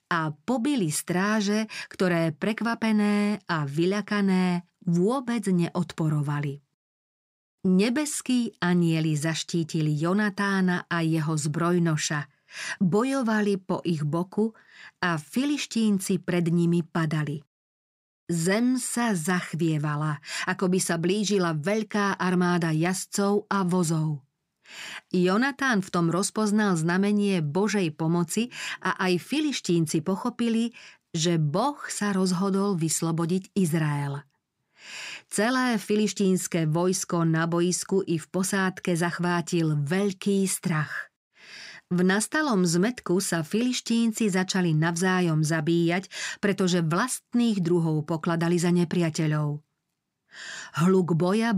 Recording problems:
abrupt cut into speech; at the end

